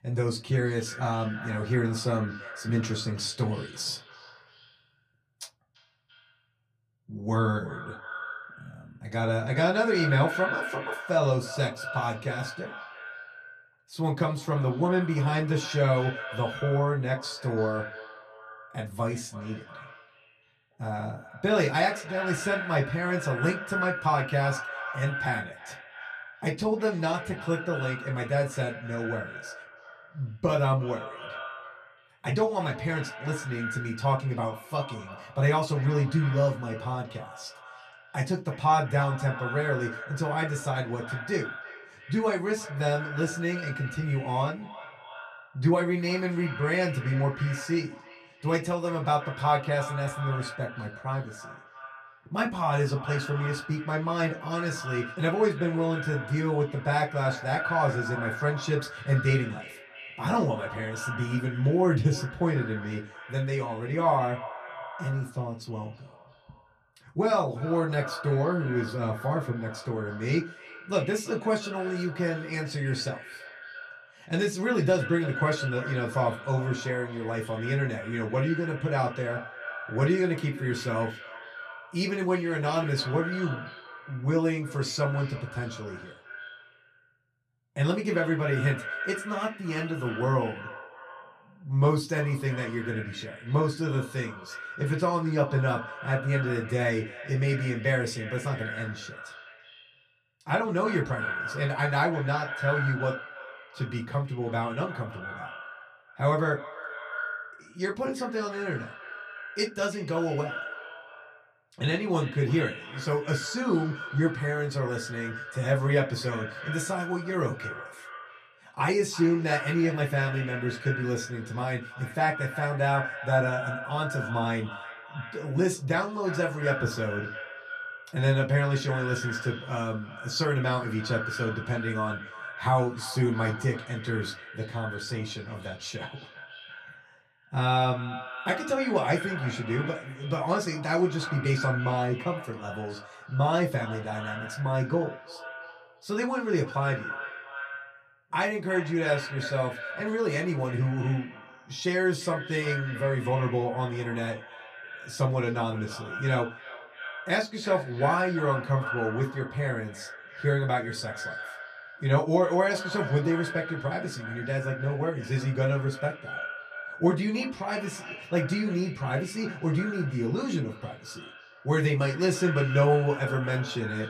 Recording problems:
echo of what is said; strong; throughout; 340 ms later, 10 dB below the speech
off-mic speech; far
room echo; very slight; dies away in 0.2 s

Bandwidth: 14.5 kHz